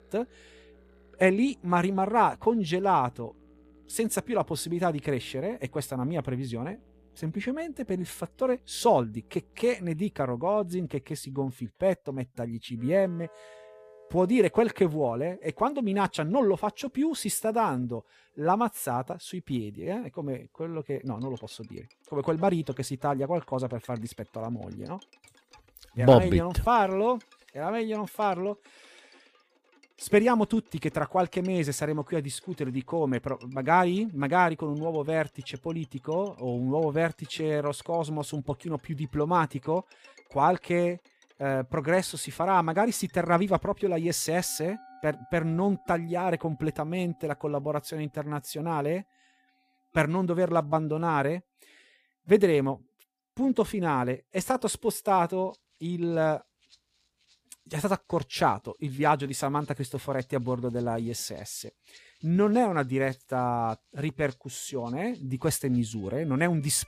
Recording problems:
background music; faint; throughout; 30 dB below the speech

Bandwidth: 15 kHz